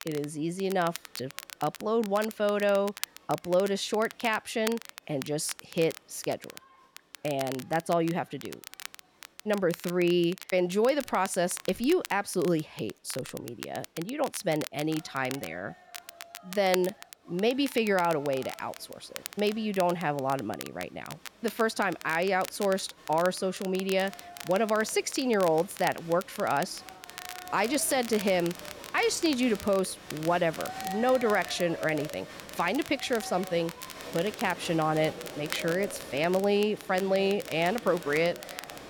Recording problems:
crowd noise; noticeable; throughout; 15 dB below the speech
crackle, like an old record; noticeable; 15 dB below the speech

